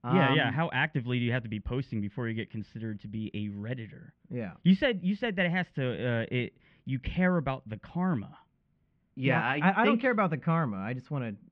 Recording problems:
muffled; very; fading above 2.5 kHz

